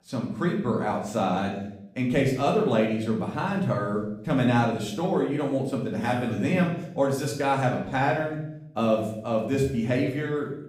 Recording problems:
off-mic speech; far
room echo; noticeable; dies away in 0.7 s

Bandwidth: 15.5 kHz